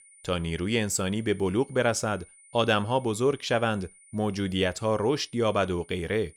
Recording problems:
high-pitched whine; faint; throughout; 9.5 kHz, 25 dB below the speech

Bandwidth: 17 kHz